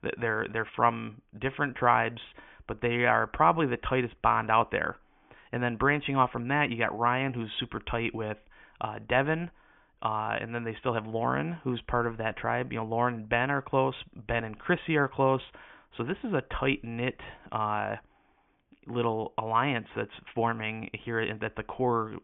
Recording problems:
high frequencies cut off; severe; nothing above 3.5 kHz

